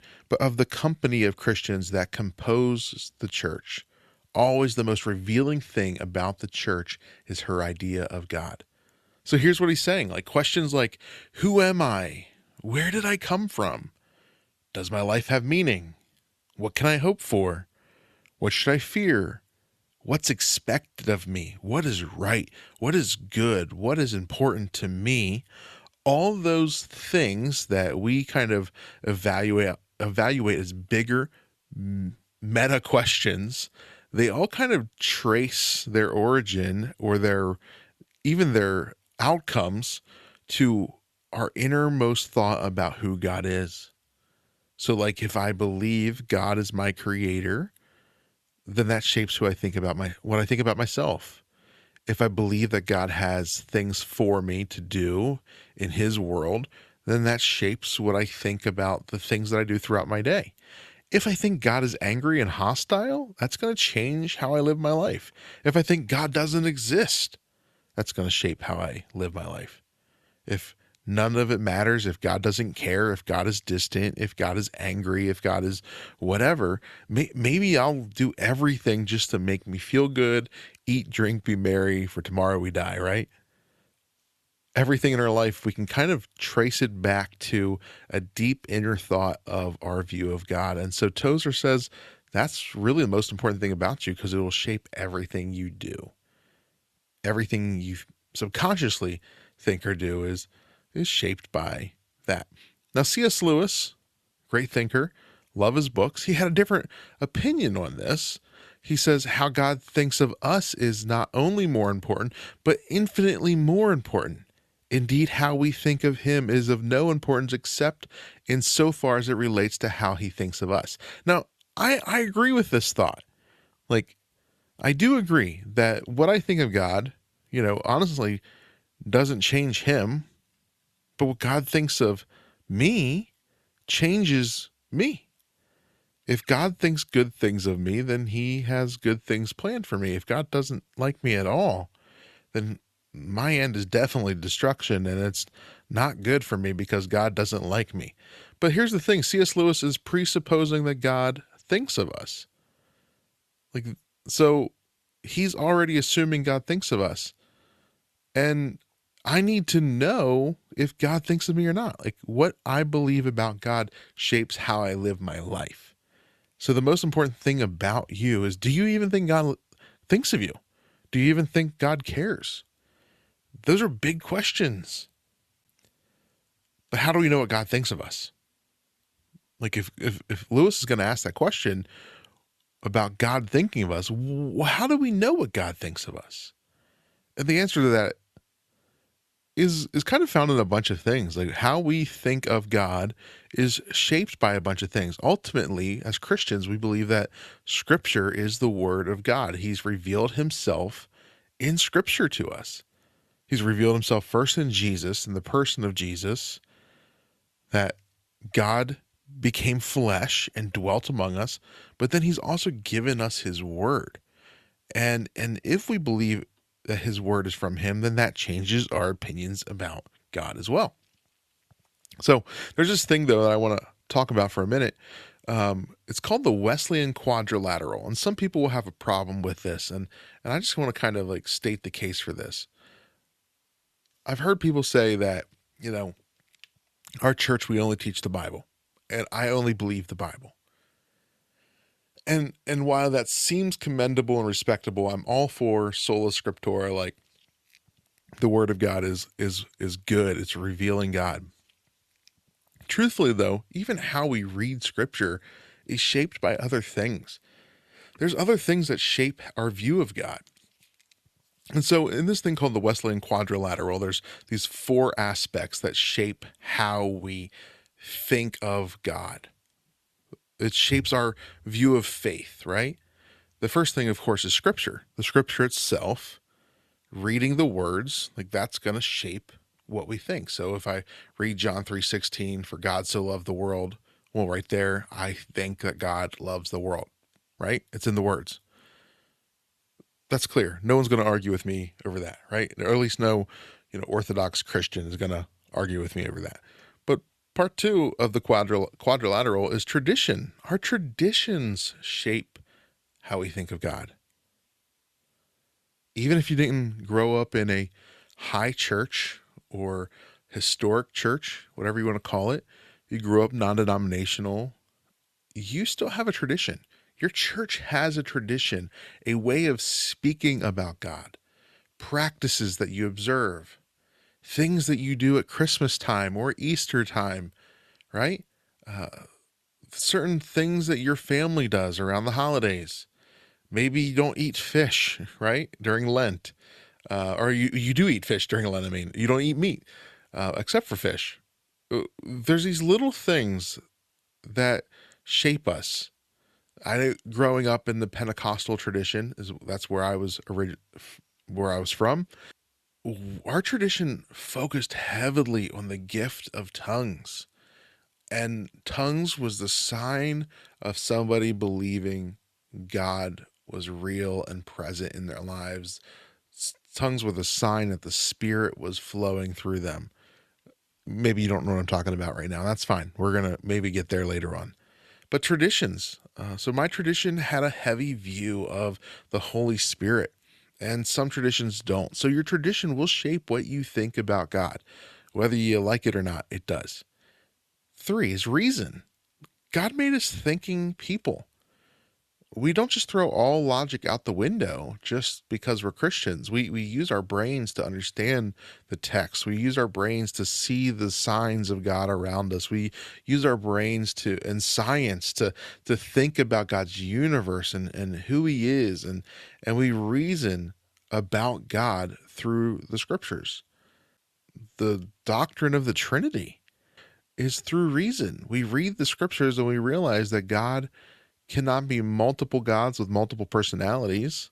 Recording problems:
none

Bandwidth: 13.5 kHz